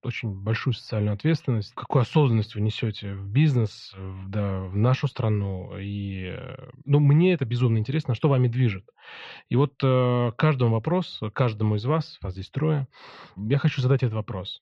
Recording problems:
muffled; very; fading above 3 kHz

